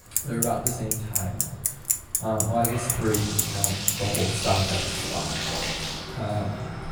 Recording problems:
off-mic speech; far
echo of what is said; noticeable; throughout; 210 ms later, 20 dB below the speech
room echo; noticeable; dies away in 0.6 s
traffic noise; very loud; throughout; 2 dB above the speech
household noises; loud; throughout; as loud as the speech

